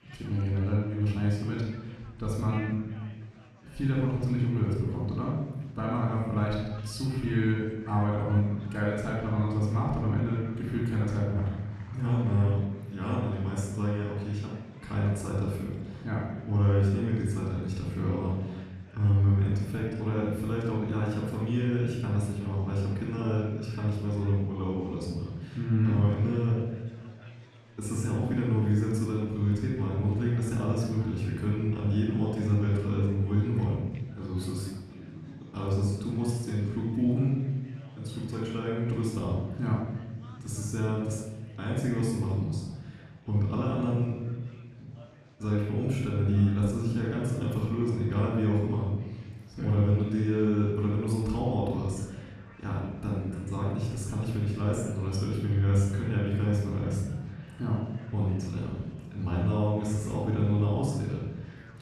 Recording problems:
off-mic speech; far
room echo; noticeable; dies away in 1.2 s
chatter from many people; faint; throughout; 25 dB below the speech

